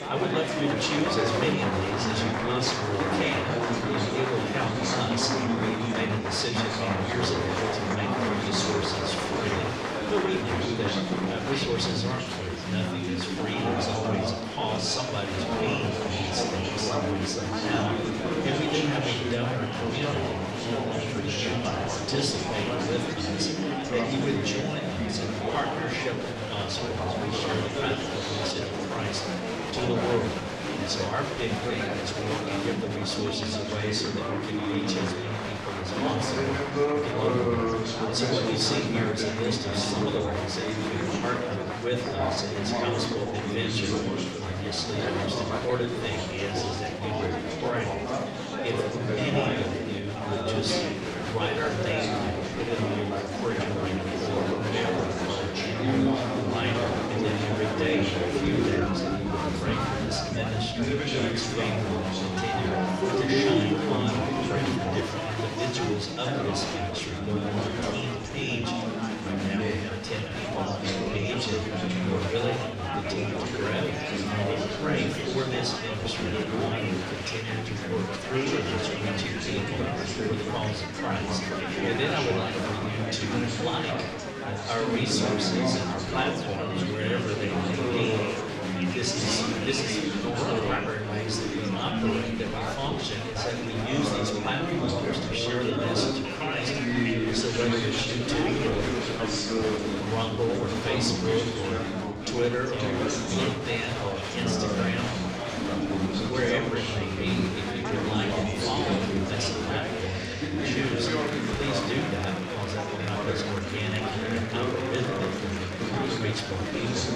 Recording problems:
room echo; slight; dies away in 0.6 s
off-mic speech; somewhat distant
chatter from many people; very loud; throughout; 2 dB above the speech

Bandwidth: 14.5 kHz